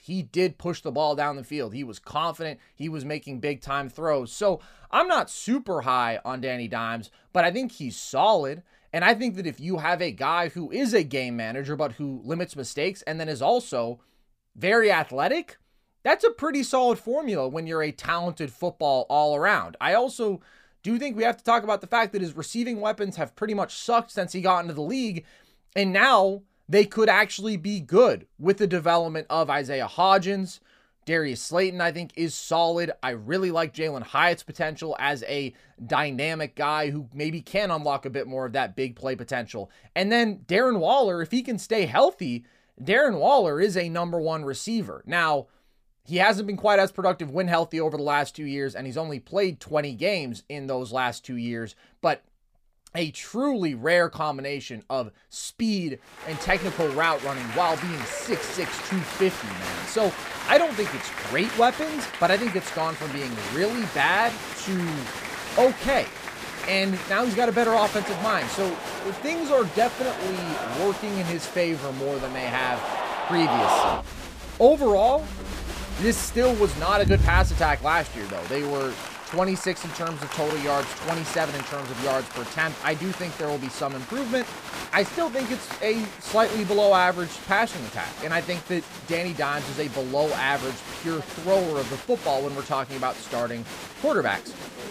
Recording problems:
crowd noise; loud; from 56 s on; 7 dB below the speech

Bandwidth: 15 kHz